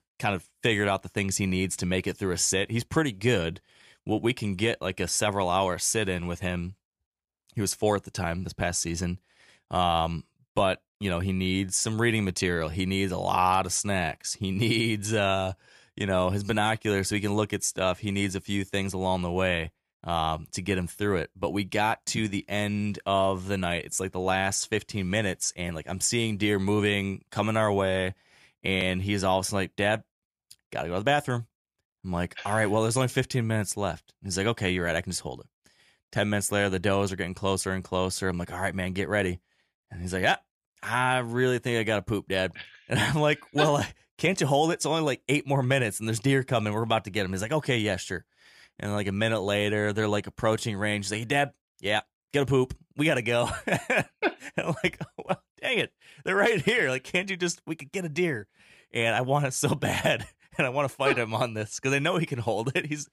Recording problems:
none

